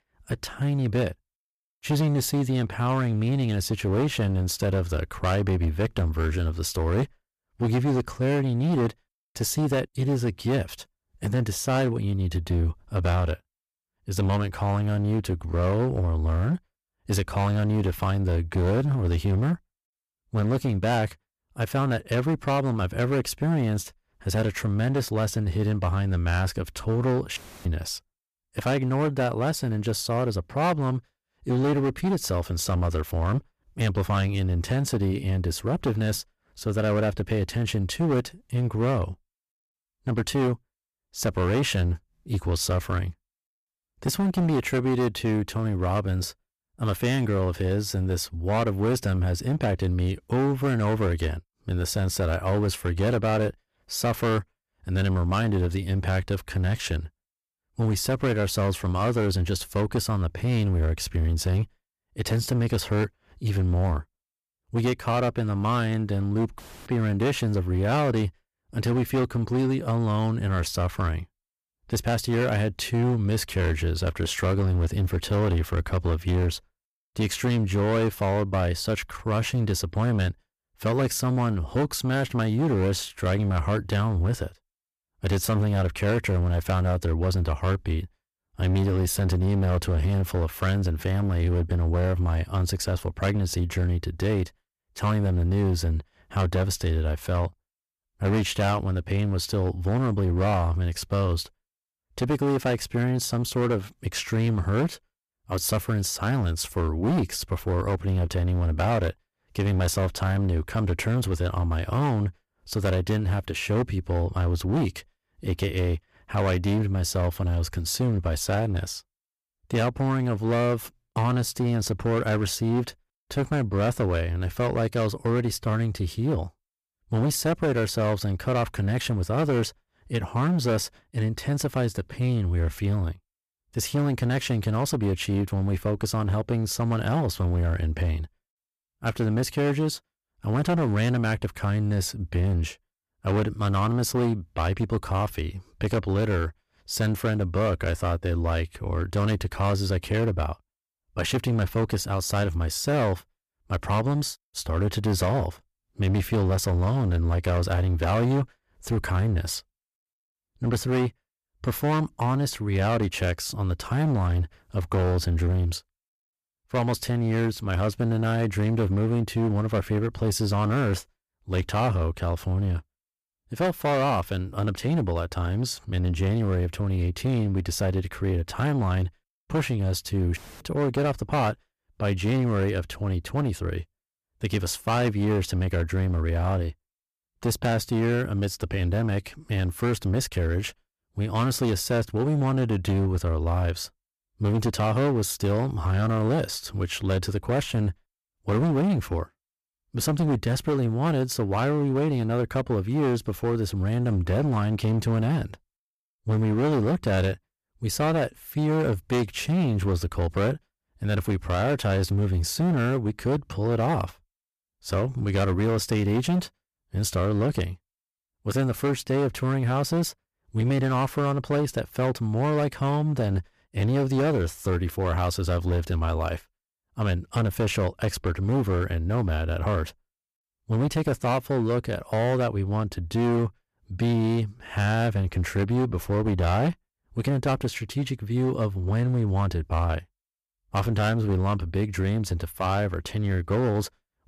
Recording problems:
distortion; slight; 14% of the sound clipped

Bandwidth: 14.5 kHz